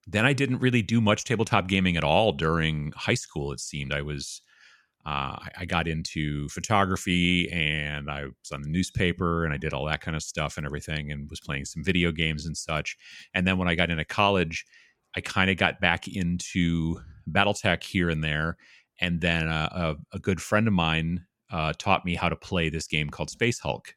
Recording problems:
none

